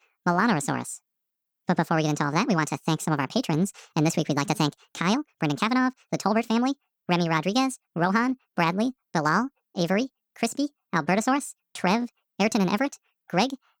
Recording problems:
wrong speed and pitch; too fast and too high; 1.6 times normal speed

